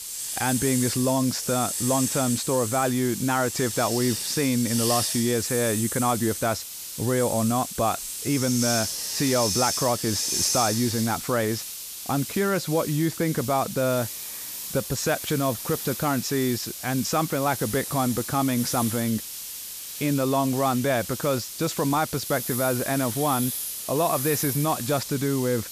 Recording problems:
hiss; loud; throughout; 4 dB below the speech

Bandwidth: 14.5 kHz